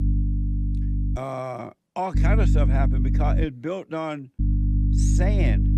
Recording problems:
electrical hum; loud; until 1 s, from 2 to 3.5 s and from 4.5 s on; 50 Hz, 6 dB below the speech

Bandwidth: 14.5 kHz